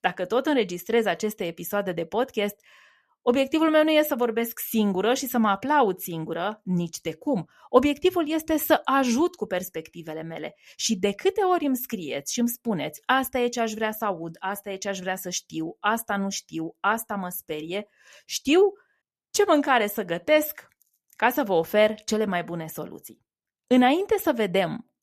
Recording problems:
none

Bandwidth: 14 kHz